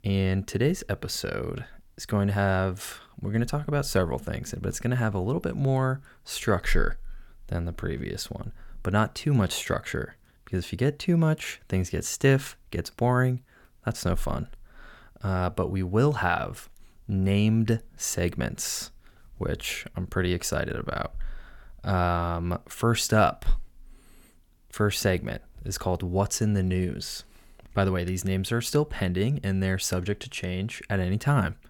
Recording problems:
none

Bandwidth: 17.5 kHz